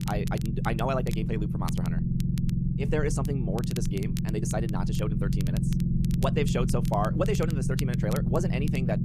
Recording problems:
wrong speed, natural pitch; too fast; 1.6 times normal speed
low rumble; loud; throughout; 5 dB below the speech
crackle, like an old record; noticeable; 15 dB below the speech

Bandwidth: 14.5 kHz